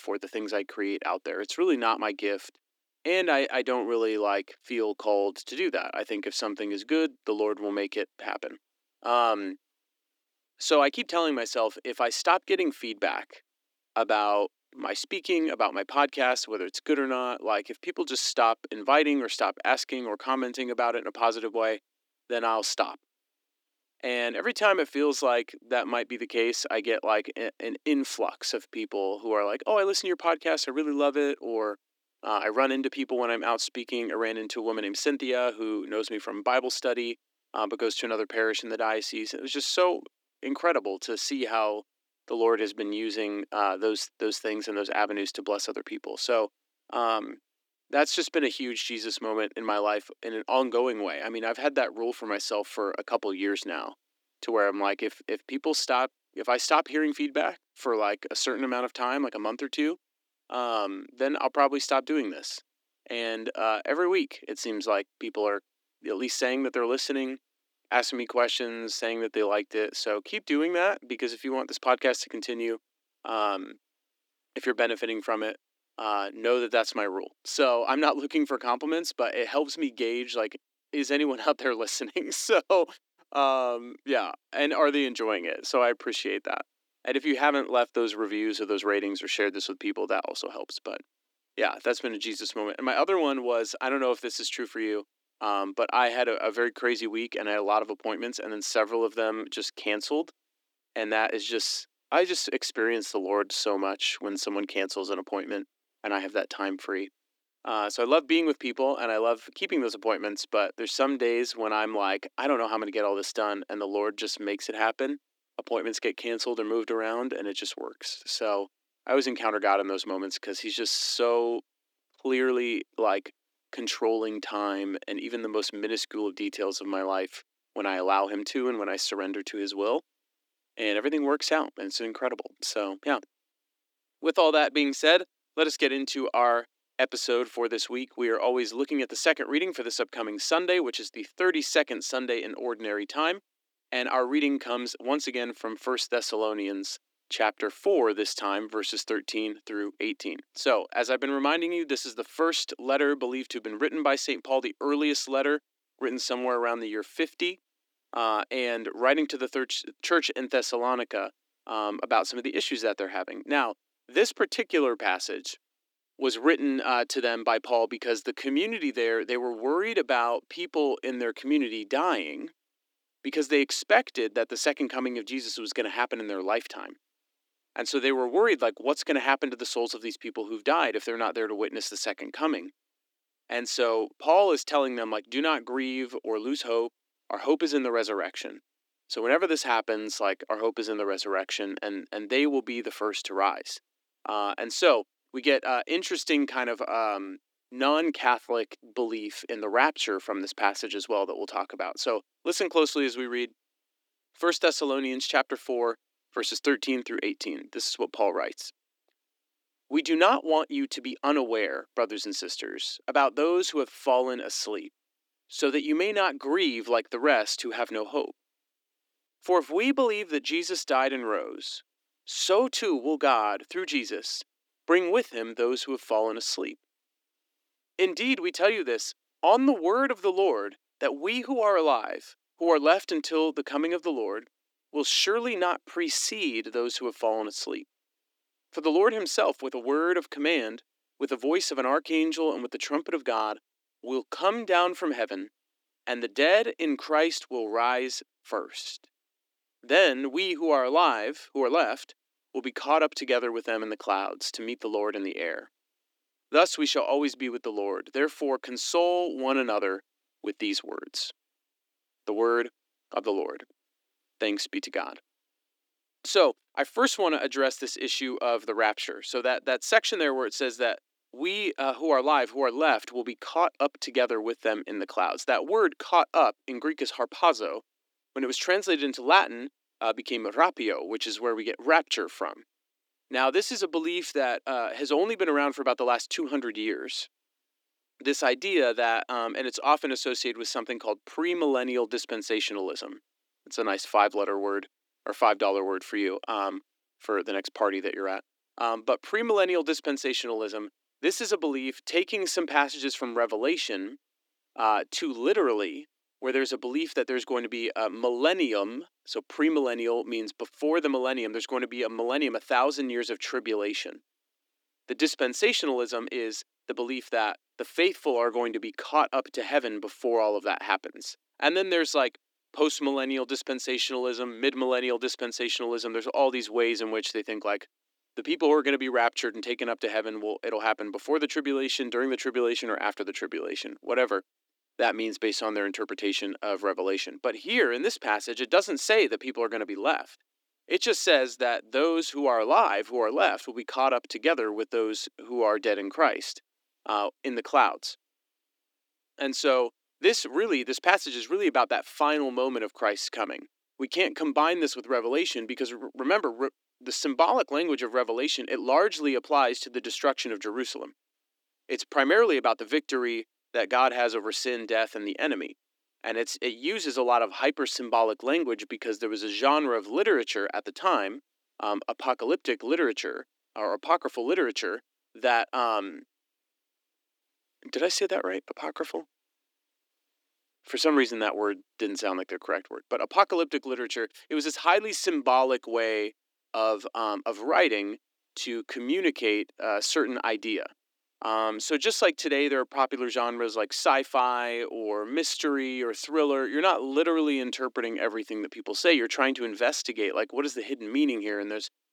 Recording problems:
thin; somewhat; fading below 300 Hz

